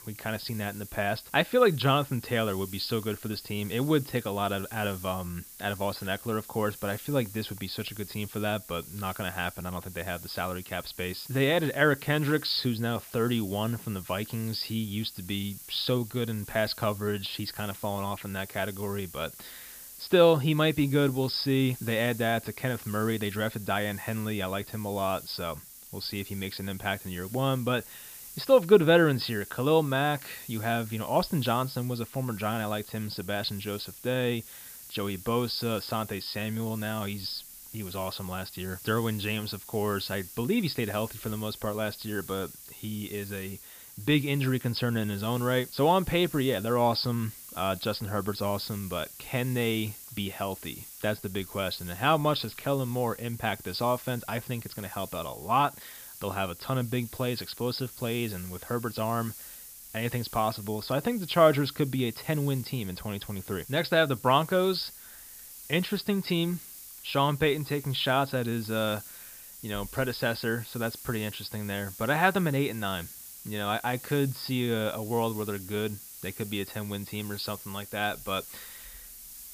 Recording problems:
high frequencies cut off; noticeable; nothing above 5.5 kHz
hiss; noticeable; throughout; 15 dB below the speech

